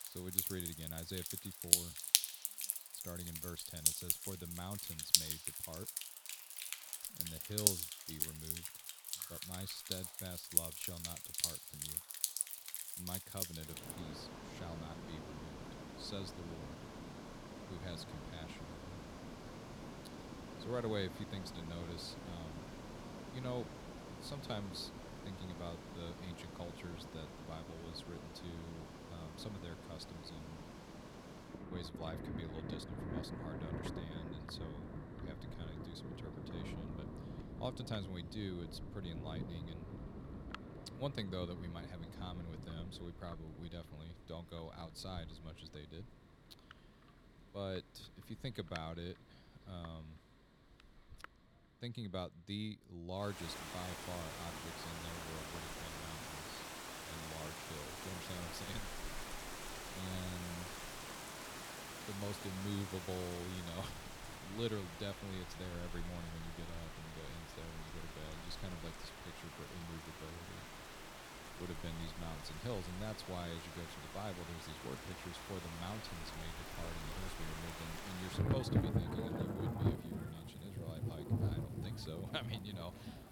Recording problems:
rain or running water; very loud; throughout; 5 dB above the speech

